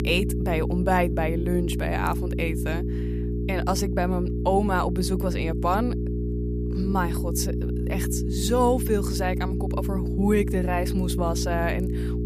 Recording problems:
electrical hum; loud; throughout; 60 Hz, 8 dB below the speech

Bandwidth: 14.5 kHz